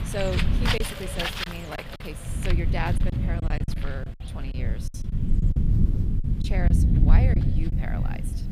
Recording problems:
echo of what is said; noticeable; throughout; 220 ms later, 15 dB below the speech
animal sounds; very loud; throughout; 2 dB above the speech
low rumble; loud; throughout; 3 dB below the speech
wind noise on the microphone; occasional gusts; 15 dB below the speech
choppy; very; 7% of the speech affected

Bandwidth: 15 kHz